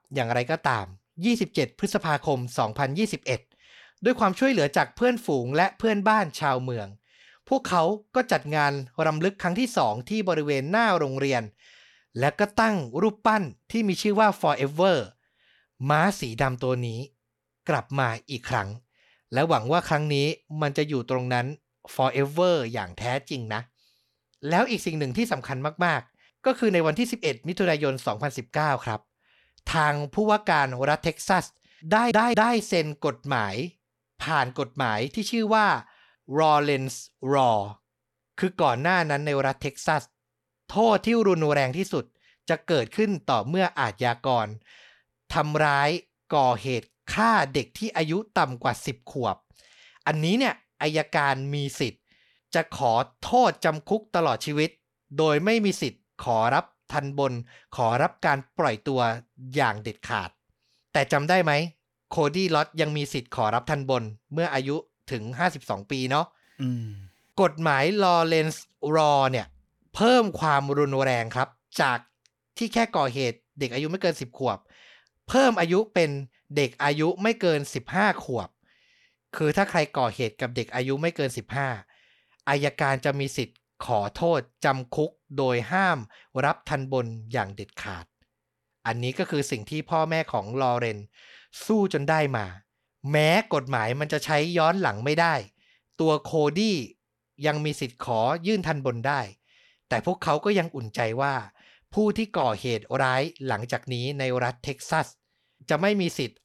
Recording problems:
audio stuttering; at 32 s

